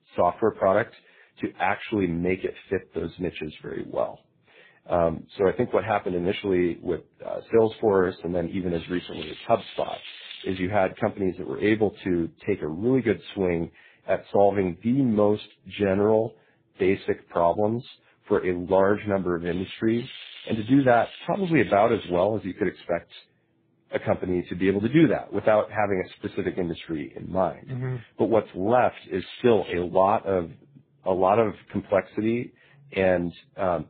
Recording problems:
garbled, watery; badly
high frequencies cut off; severe; nothing above 4 kHz
crackling; noticeable; from 9 to 11 s, from 19 to 22 s and at 29 s; 15 dB below the speech

